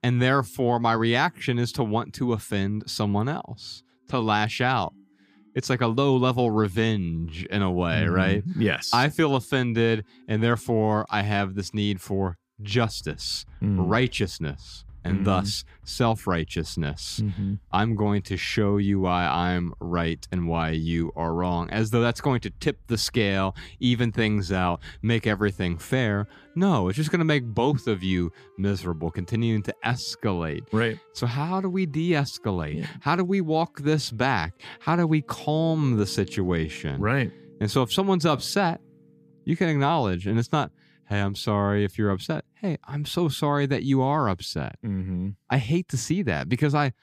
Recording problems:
background music; faint; throughout; 25 dB below the speech

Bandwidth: 15 kHz